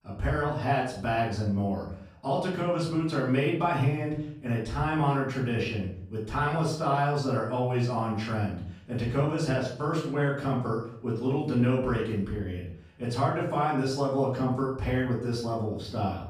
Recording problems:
off-mic speech; far
room echo; noticeable; dies away in 0.5 s

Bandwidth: 15 kHz